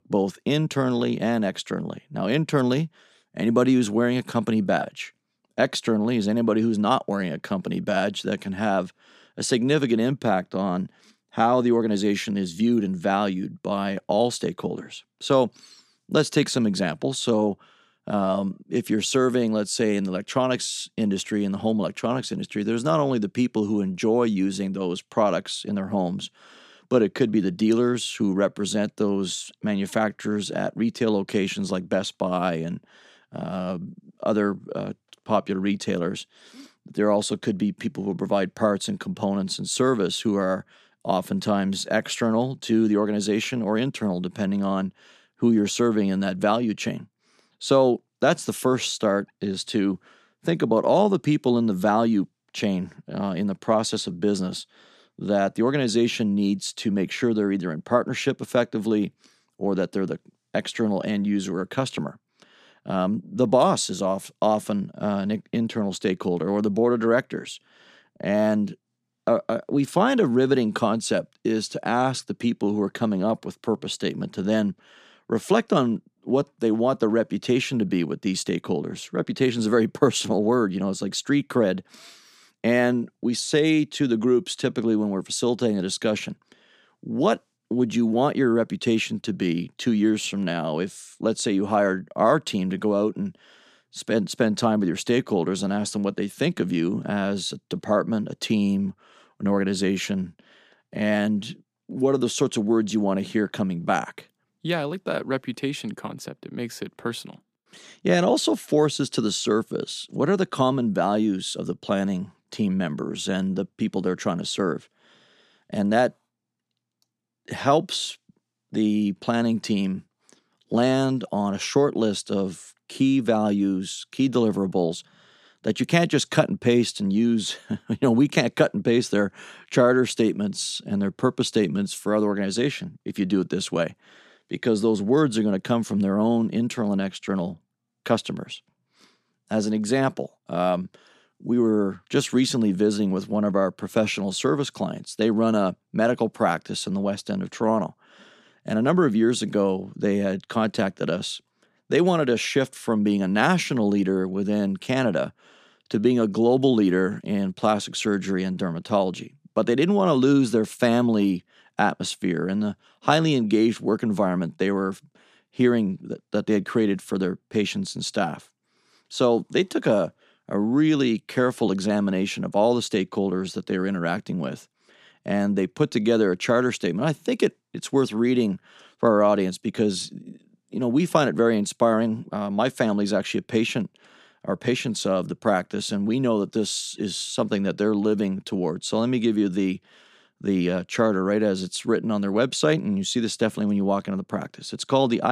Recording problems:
abrupt cut into speech; at the end

